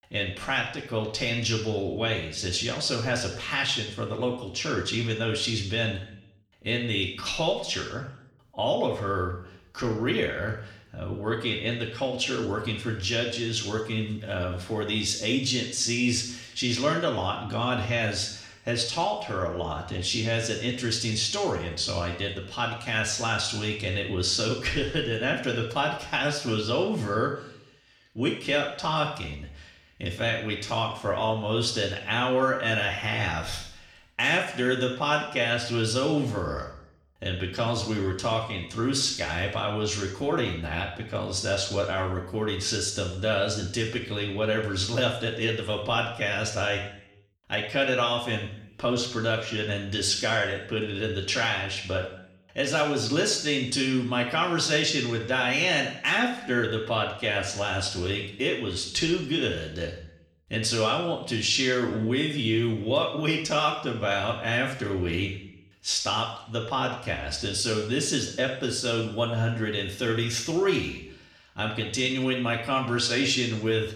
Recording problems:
room echo; noticeable; dies away in 0.7 s
off-mic speech; somewhat distant

